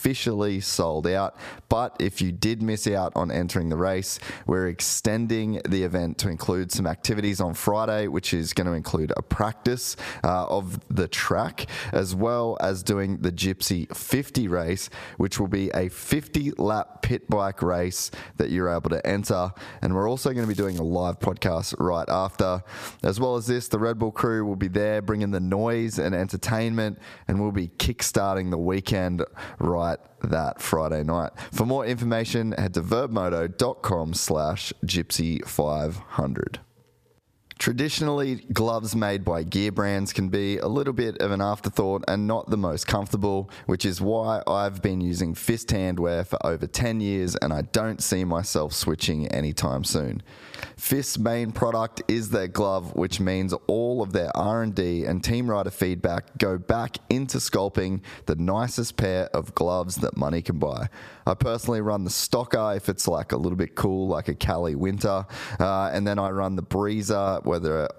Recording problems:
squashed, flat; heavily
crackling; noticeable; at 20 s; 20 dB below the speech

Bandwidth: 14.5 kHz